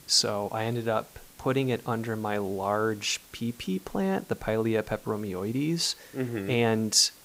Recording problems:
hiss; faint; throughout; 25 dB below the speech

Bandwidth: 15.5 kHz